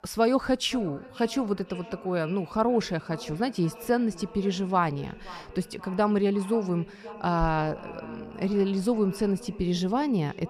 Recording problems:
echo of what is said; noticeable; throughout; 530 ms later, 15 dB below the speech

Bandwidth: 14.5 kHz